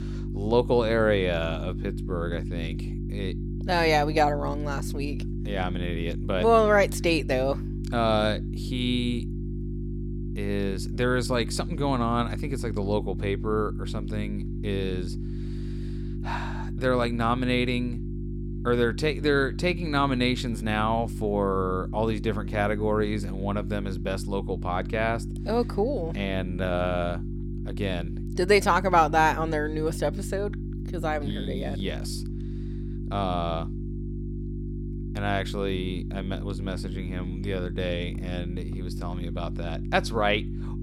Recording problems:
electrical hum; noticeable; throughout; 50 Hz, 15 dB below the speech

